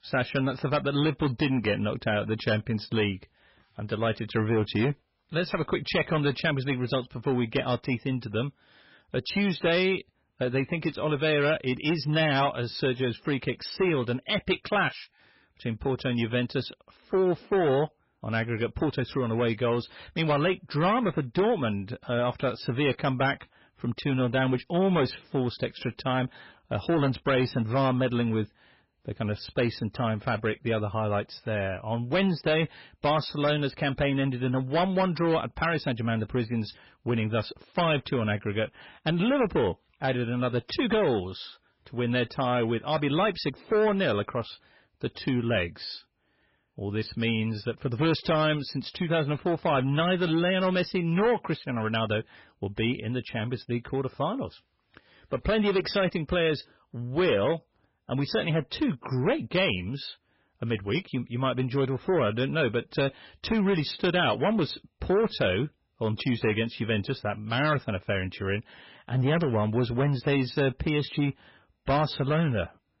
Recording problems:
garbled, watery; badly; nothing above 5.5 kHz
distortion; slight; 7% of the sound clipped

